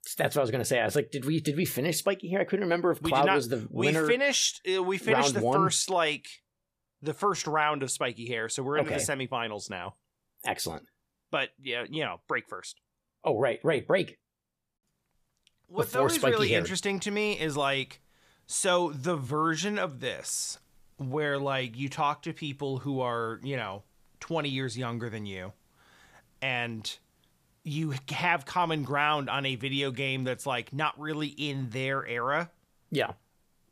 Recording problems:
uneven, jittery; strongly; from 7 to 32 s

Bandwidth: 15 kHz